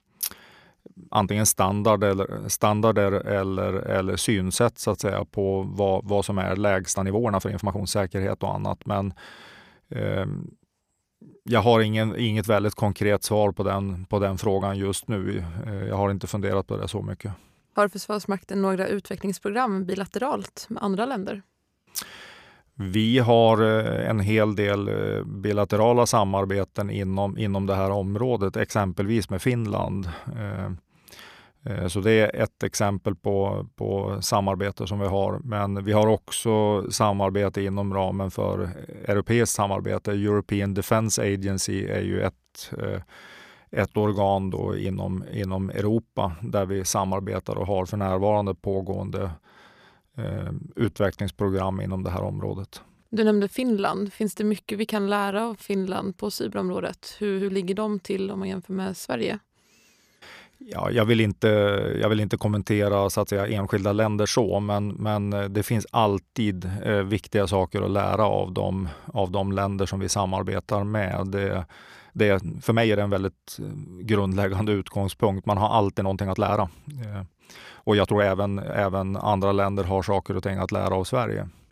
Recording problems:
uneven, jittery; strongly; from 1 s to 1:19

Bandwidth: 14.5 kHz